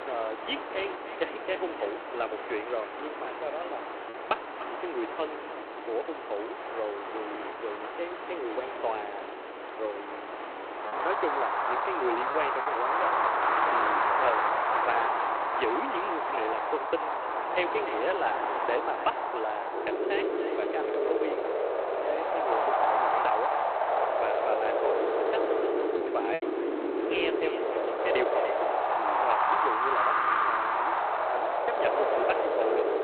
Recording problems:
phone-call audio; poor line
echo of what is said; noticeable; throughout; 300 ms later, 15 dB below the speech
wind in the background; very loud; throughout; 5 dB above the speech
choppy; occasionally; from 11 to 13 s and at 26 s; 2% of the speech affected

